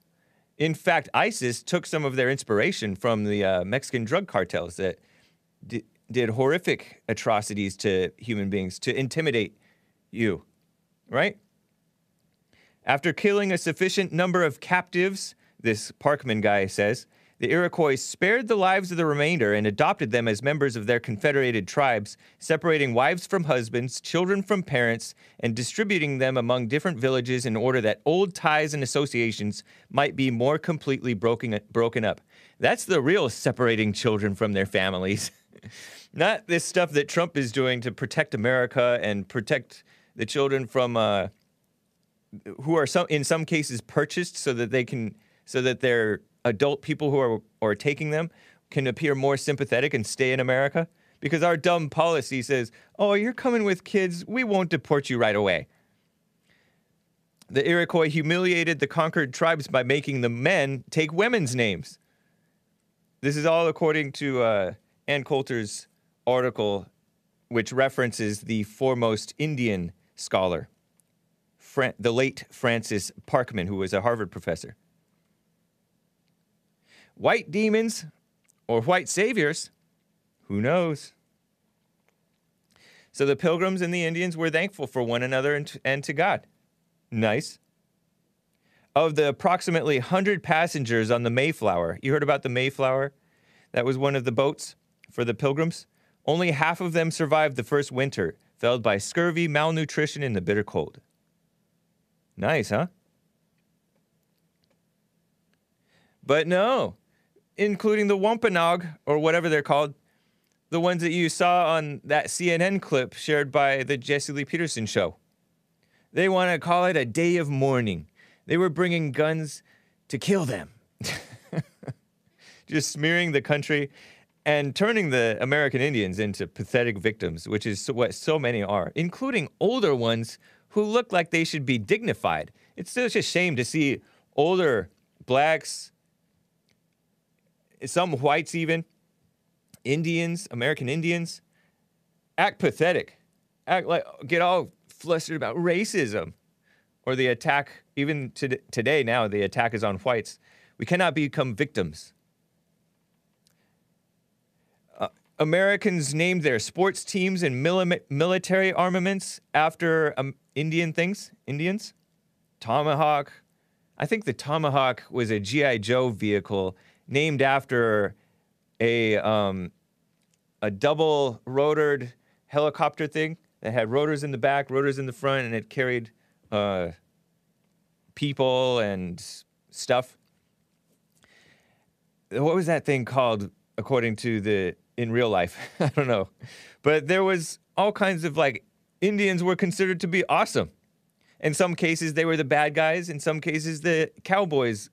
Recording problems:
none

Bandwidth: 14.5 kHz